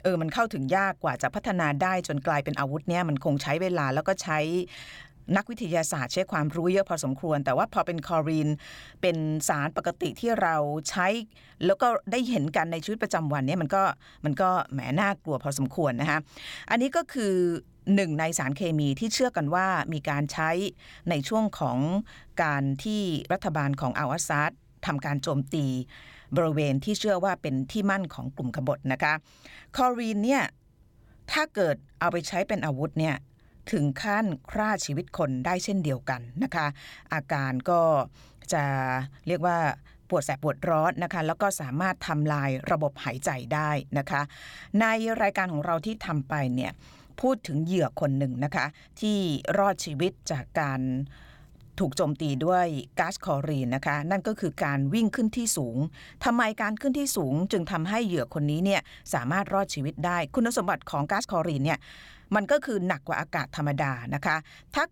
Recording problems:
uneven, jittery; strongly; from 4 s to 1:02

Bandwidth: 17.5 kHz